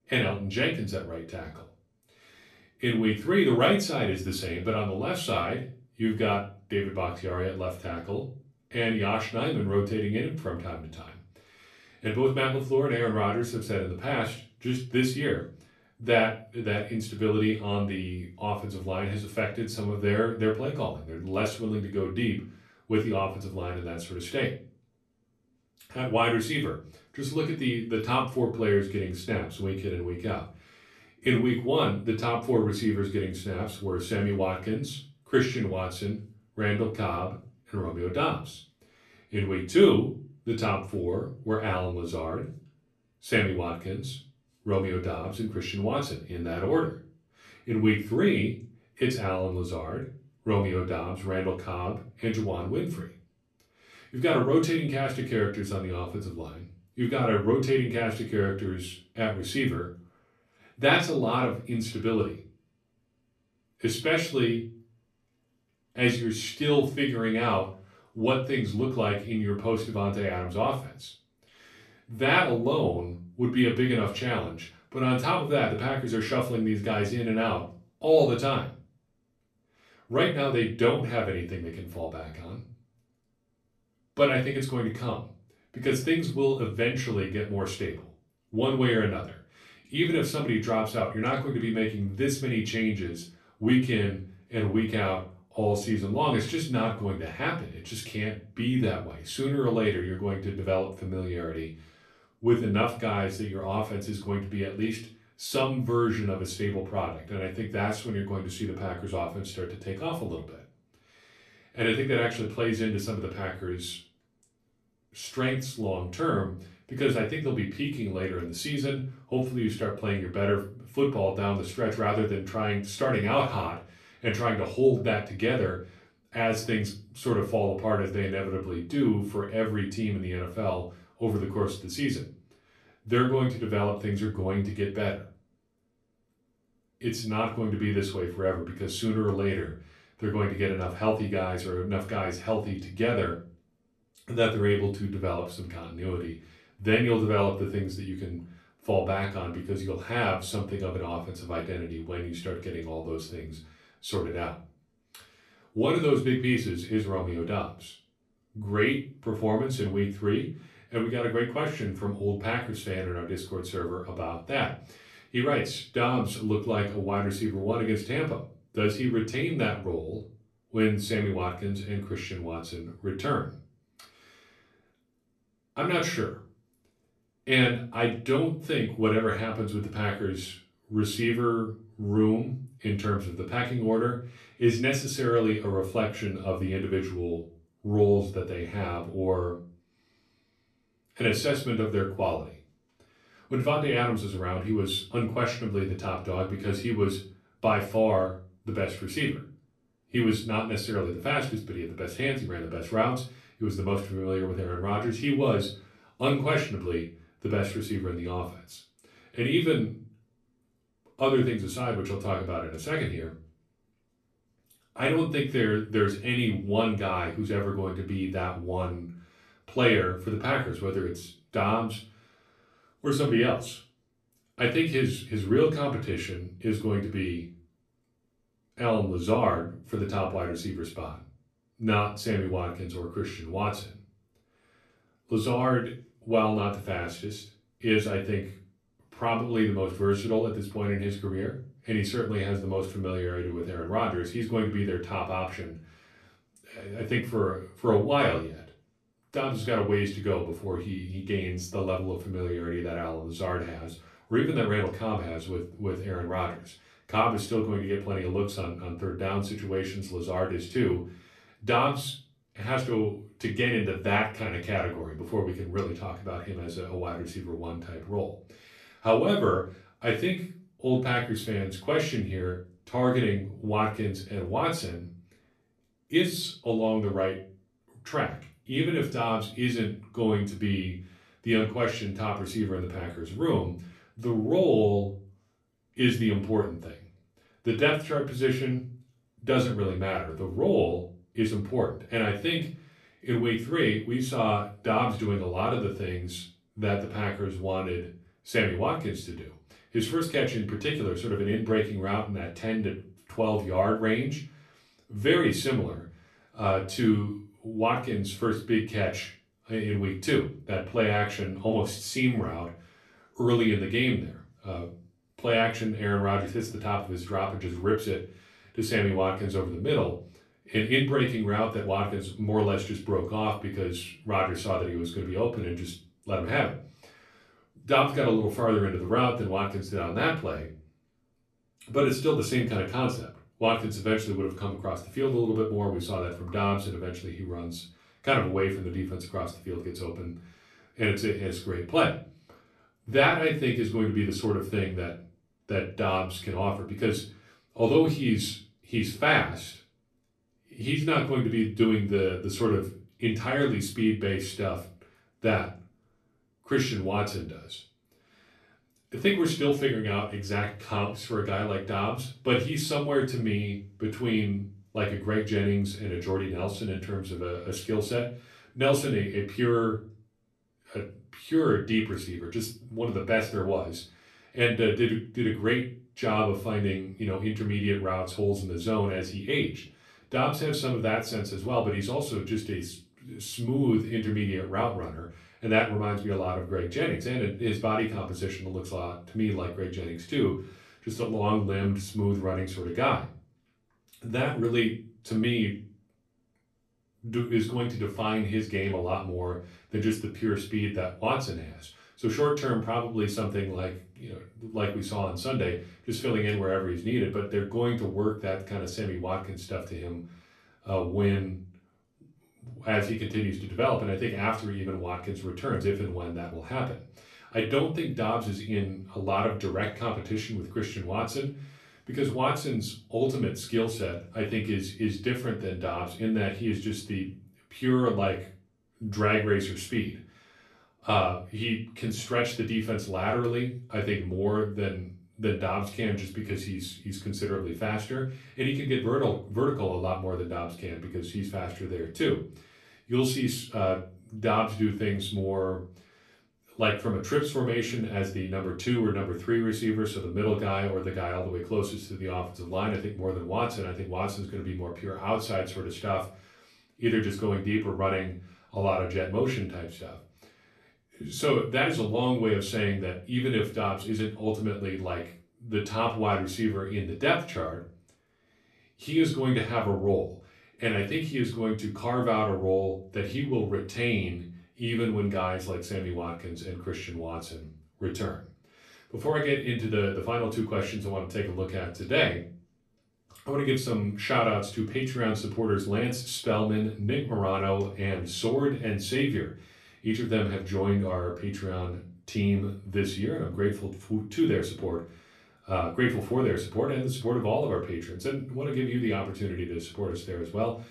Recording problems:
off-mic speech; far
room echo; slight; dies away in 0.3 s

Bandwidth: 13.5 kHz